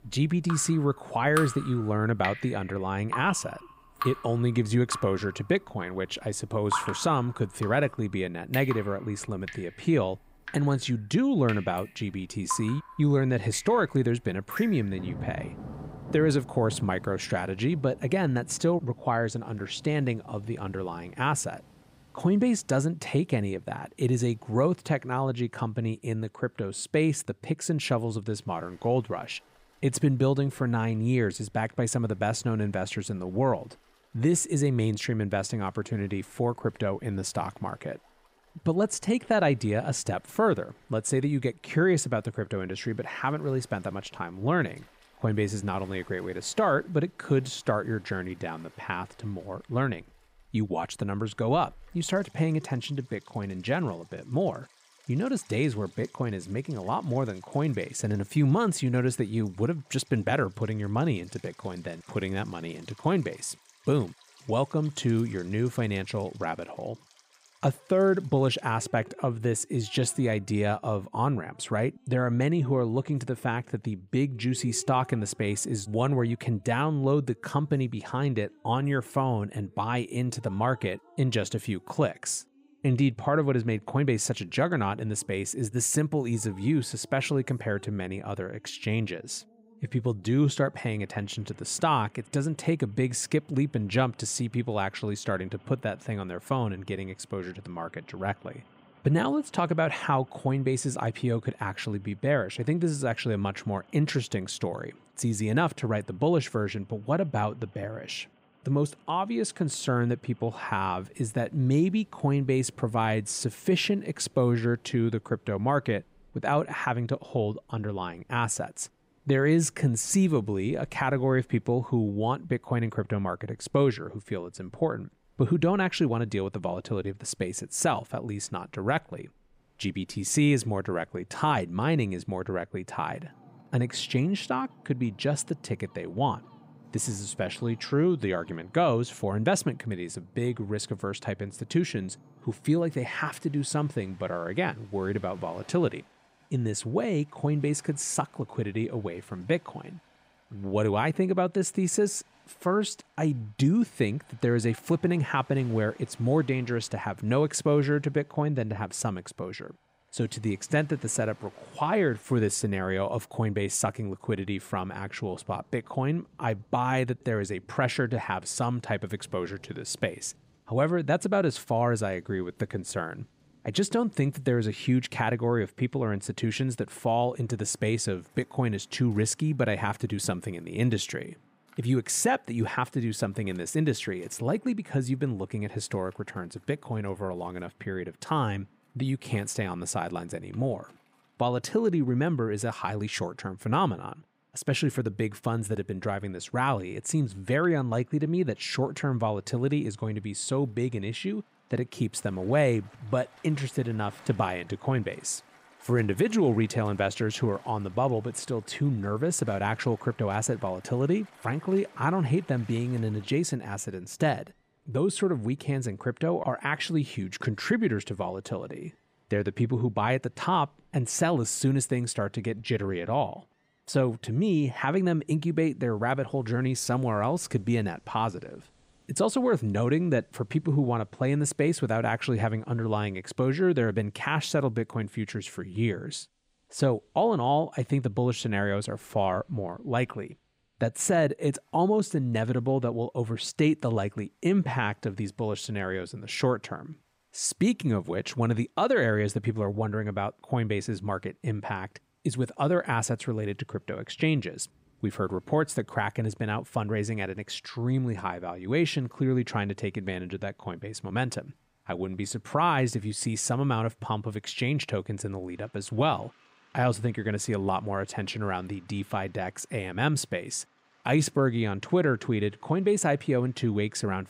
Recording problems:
rain or running water; noticeable; throughout; 20 dB below the speech

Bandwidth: 15.5 kHz